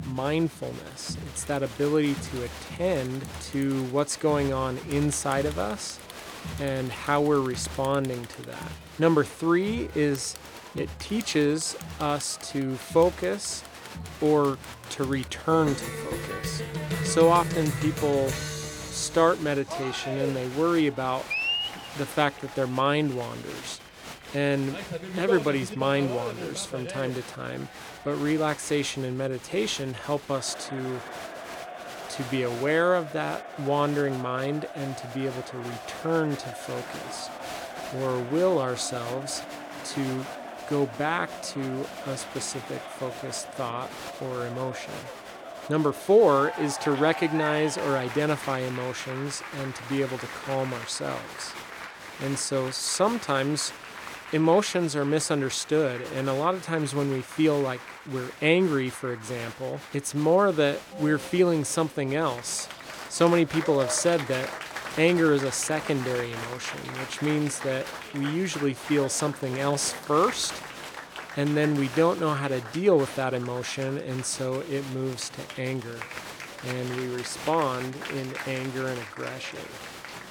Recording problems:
crowd noise; noticeable; throughout; 10 dB below the speech

